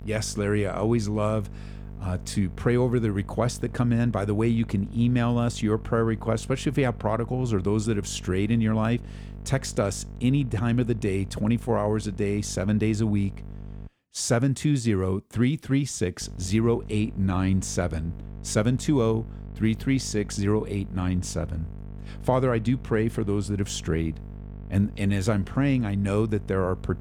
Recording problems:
electrical hum; faint; until 14 s and from 16 s on; 50 Hz, 20 dB below the speech

